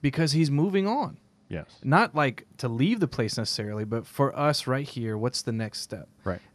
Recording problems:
none

